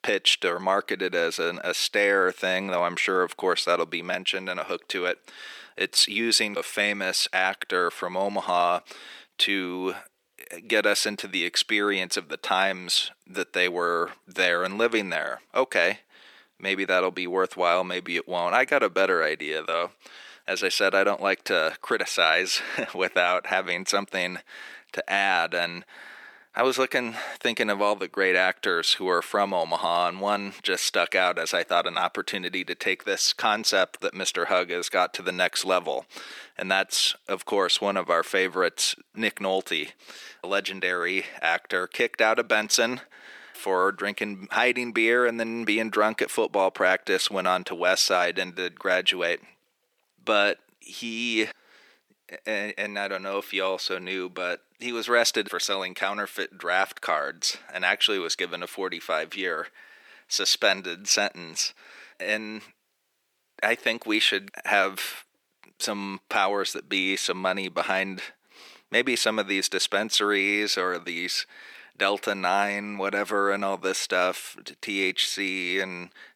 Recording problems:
thin; very; fading below 350 Hz

